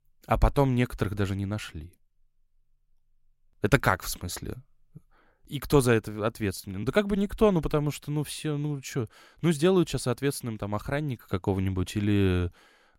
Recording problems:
none

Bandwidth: 16 kHz